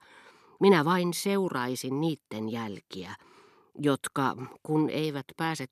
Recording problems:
none

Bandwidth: 13.5 kHz